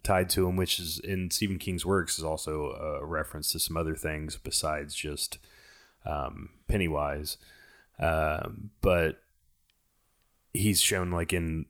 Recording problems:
none

